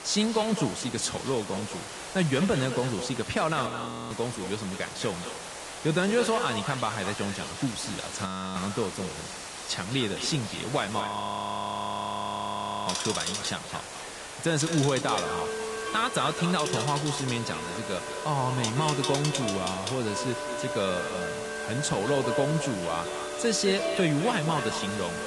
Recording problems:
echo of what is said; strong; throughout; 210 ms later, 10 dB below the speech
garbled, watery; slightly; nothing above 10.5 kHz
household noises; loud; throughout; 5 dB below the speech
hiss; loud; throughout; 9 dB below the speech
audio freezing; at 3.5 s, at 8.5 s and at 11 s for 2 s

